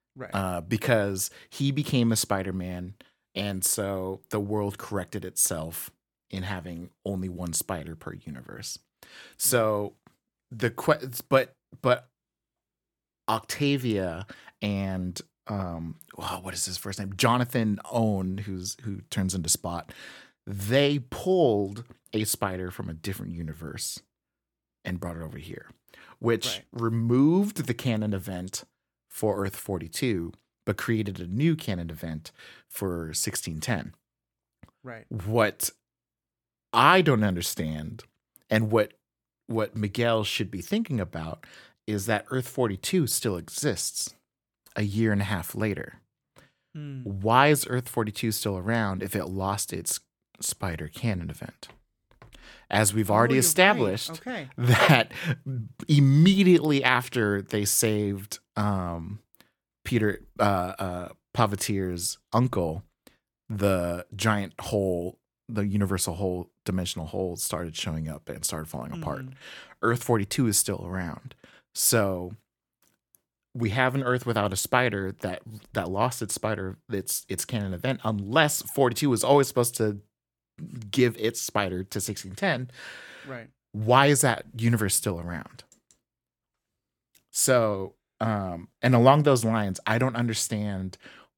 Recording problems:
none

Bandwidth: 18 kHz